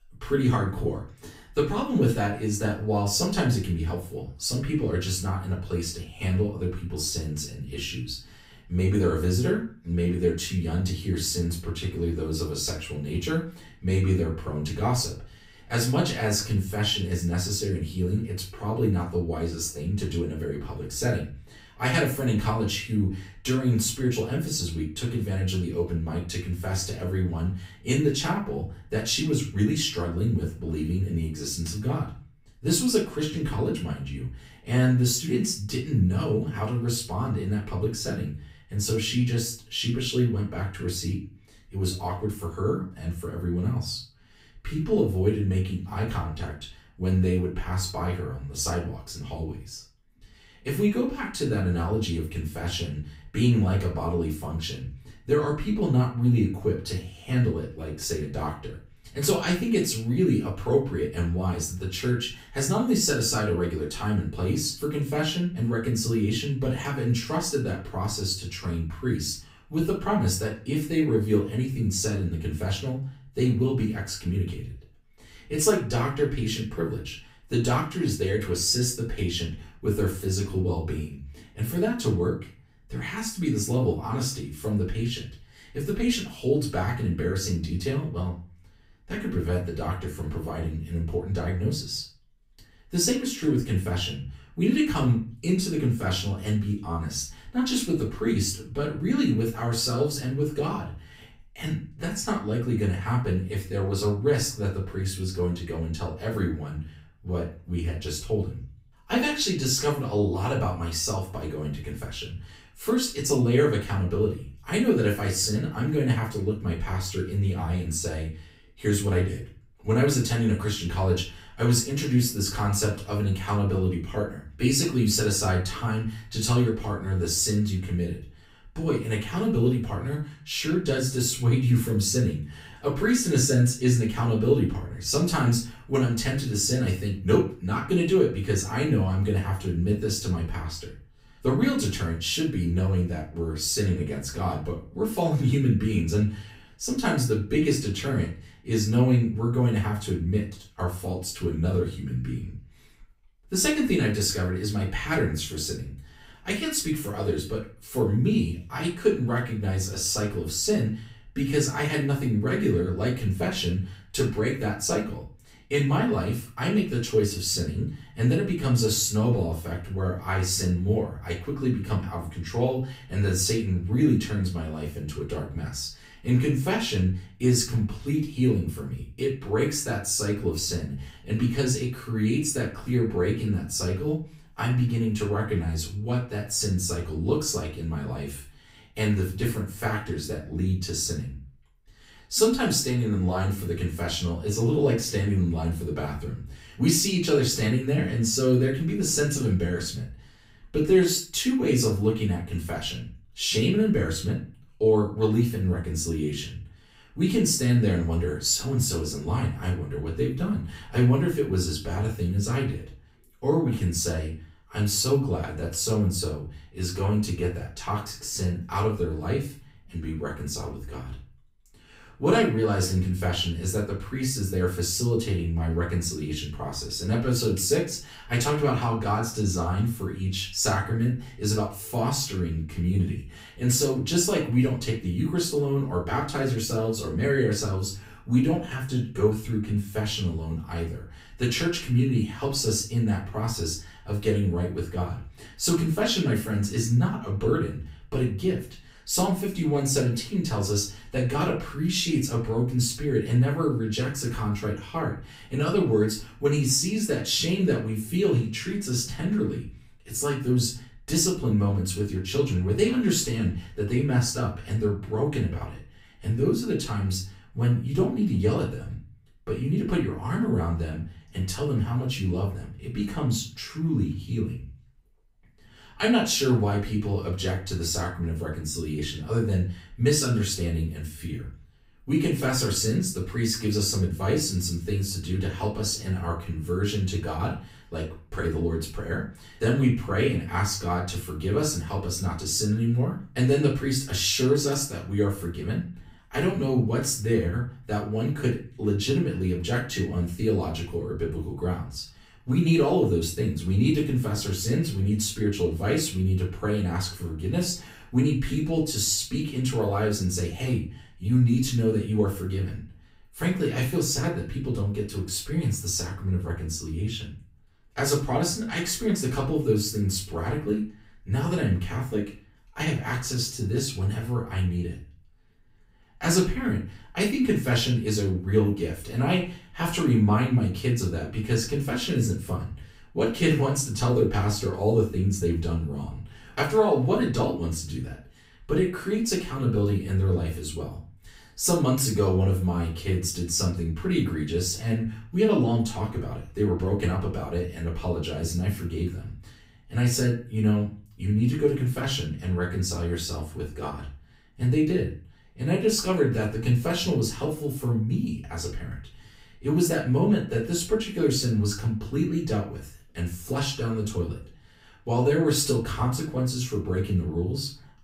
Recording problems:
off-mic speech; far
room echo; slight; dies away in 0.3 s

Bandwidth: 15.5 kHz